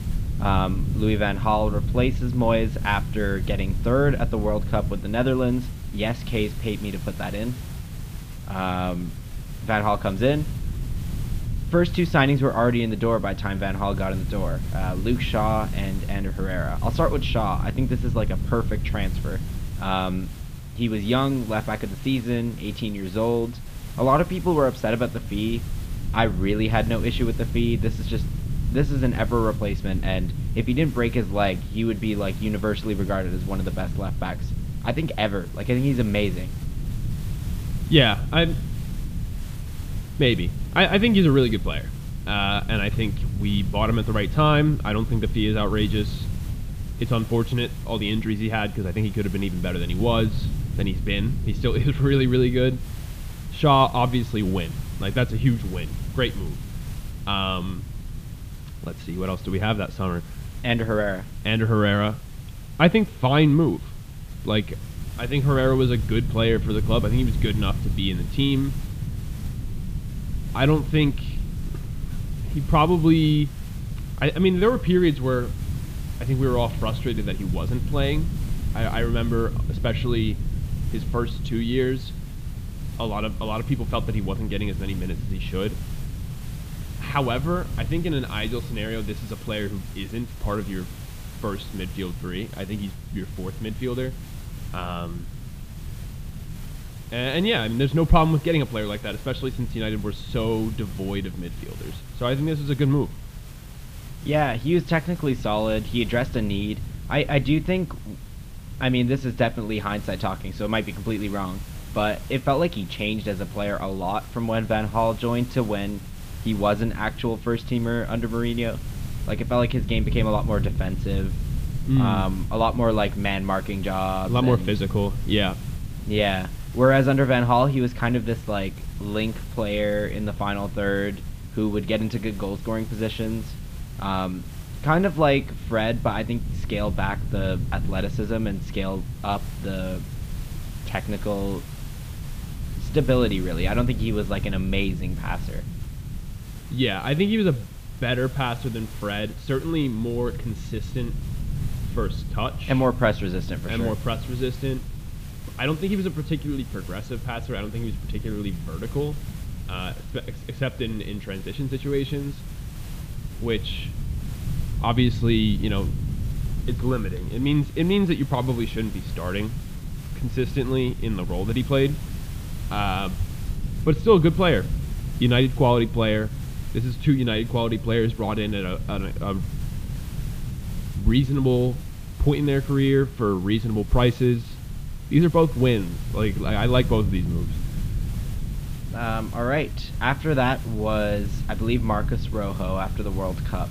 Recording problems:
muffled; slightly; fading above 3.5 kHz
low rumble; noticeable; throughout; 20 dB below the speech
hiss; faint; throughout; 20 dB below the speech

